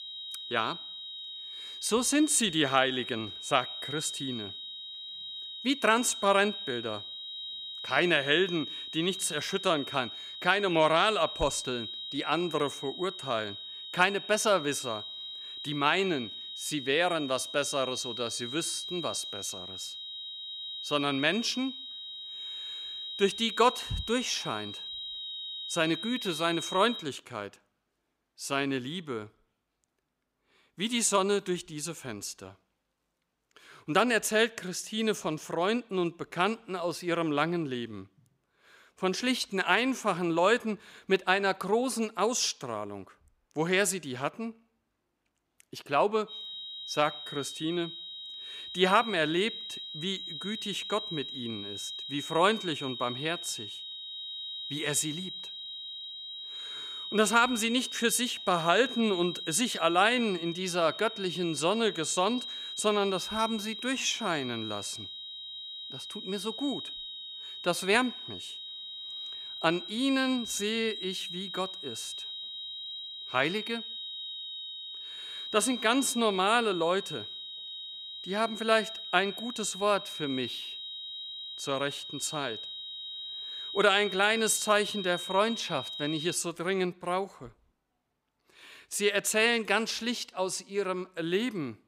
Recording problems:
high-pitched whine; loud; until 27 s and from 46 s to 1:26; 4 kHz, 8 dB below the speech

